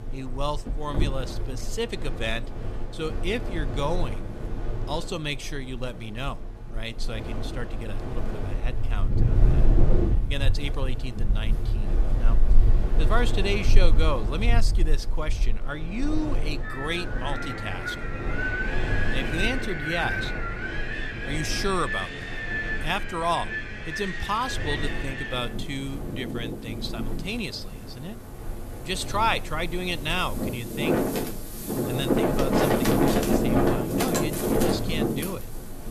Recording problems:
wind in the background; very loud; throughout; 3 dB above the speech

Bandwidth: 14 kHz